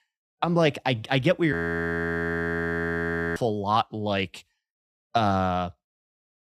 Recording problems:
audio freezing; at 1.5 s for 2 s

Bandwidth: 15.5 kHz